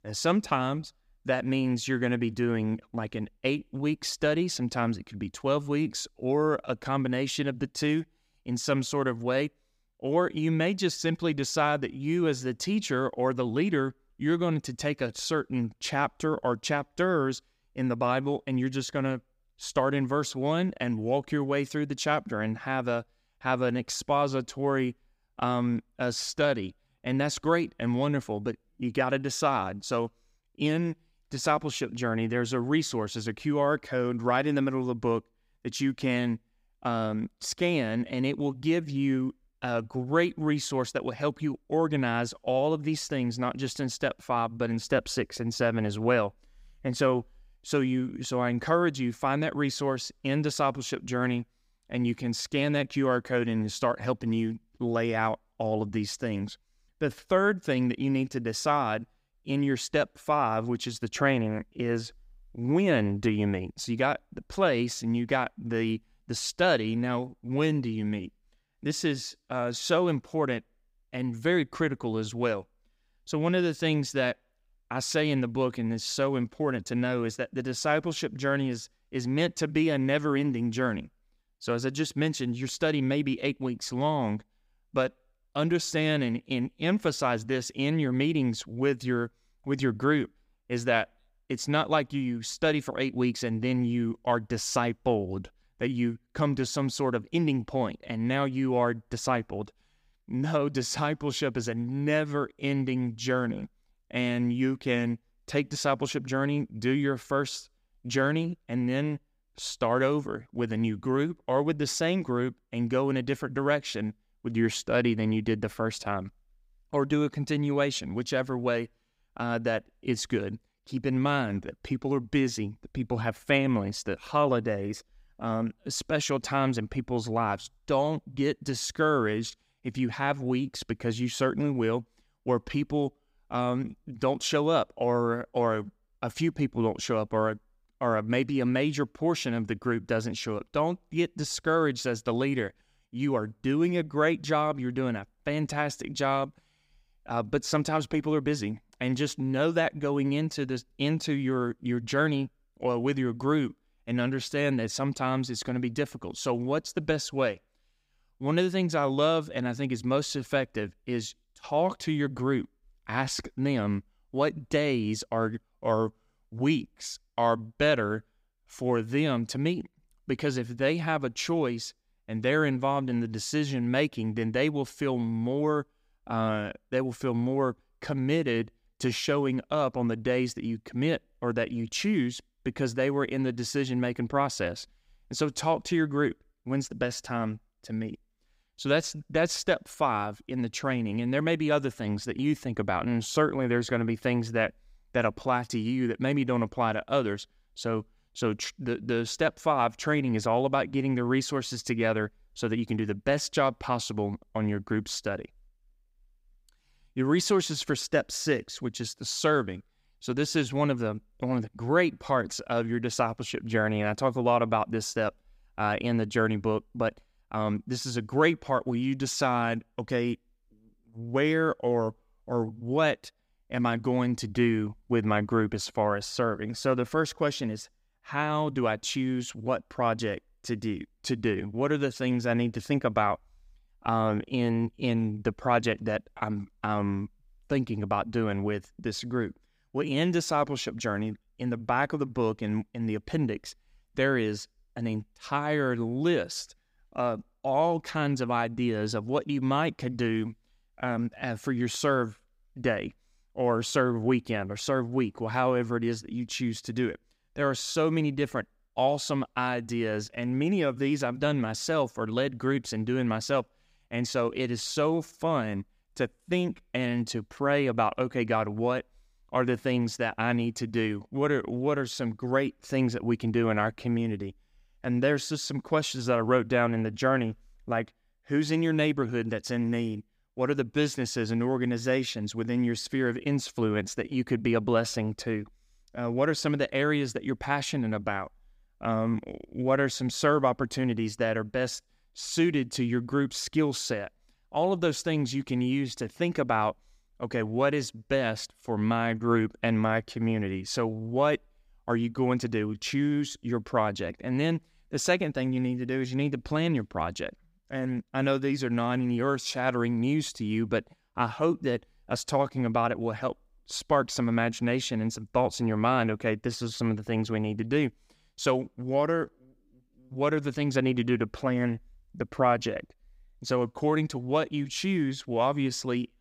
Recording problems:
none

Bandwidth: 15.5 kHz